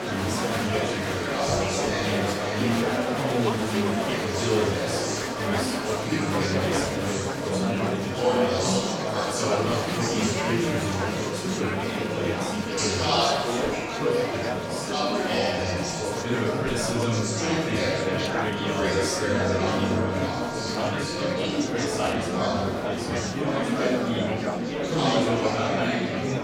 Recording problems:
off-mic speech; far
room echo; noticeable; dies away in 0.6 s
murmuring crowd; very loud; throughout; 5 dB above the speech
background music; loud; throughout; 9 dB below the speech

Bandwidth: 17 kHz